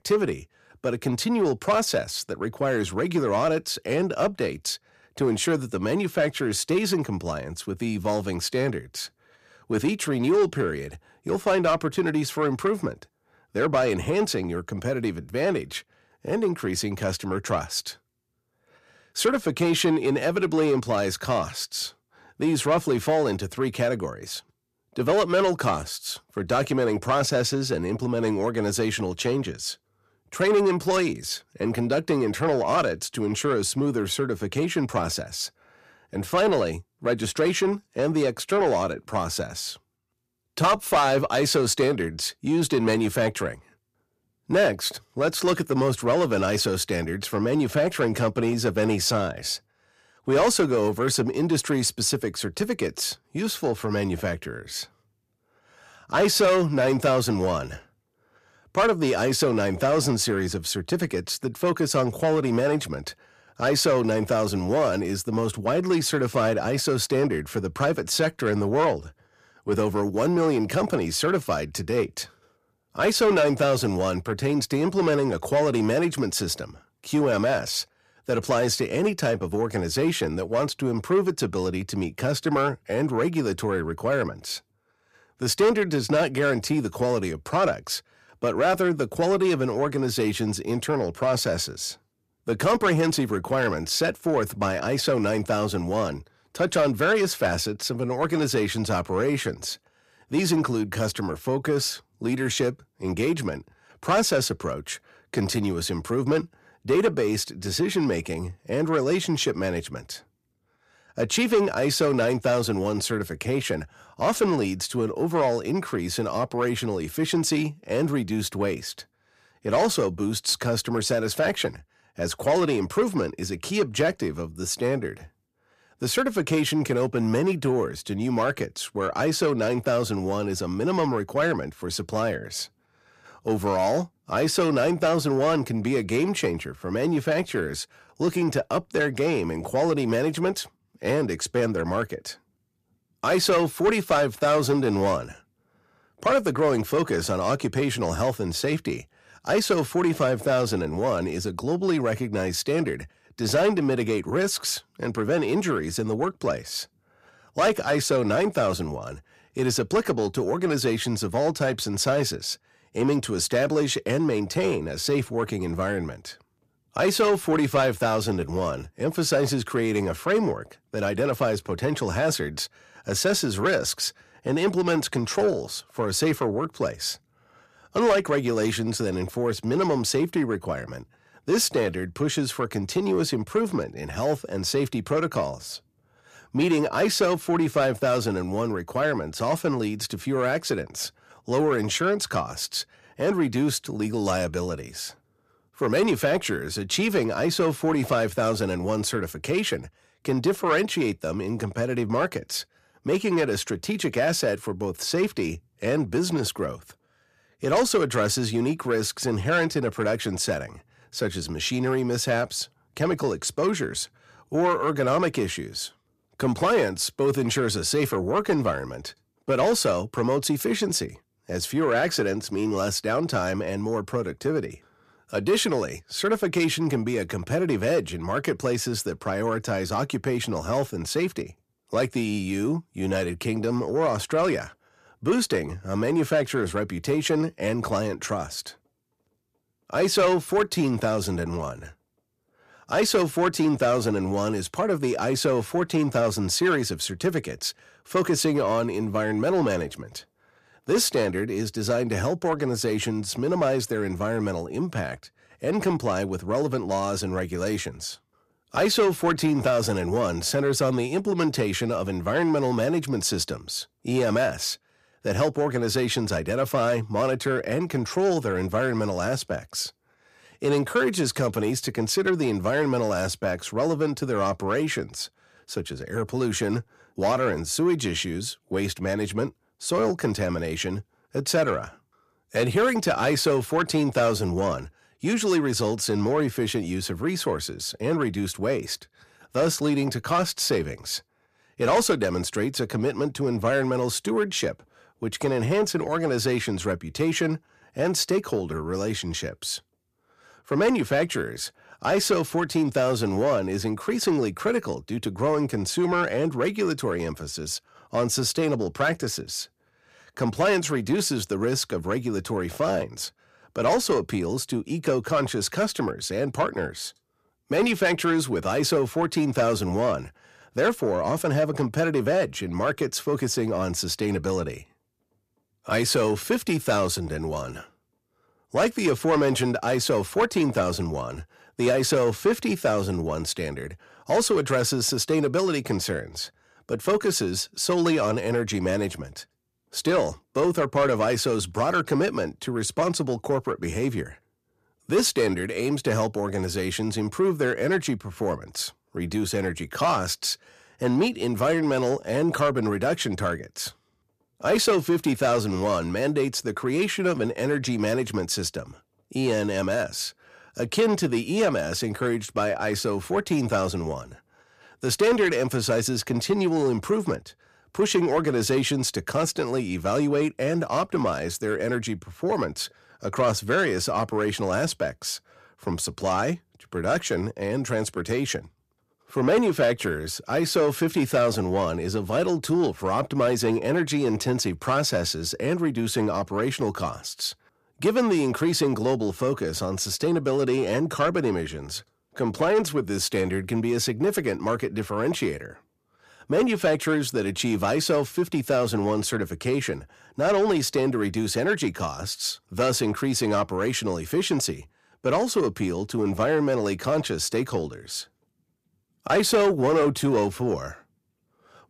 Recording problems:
distortion; slight; 10 dB below the speech

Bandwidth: 14.5 kHz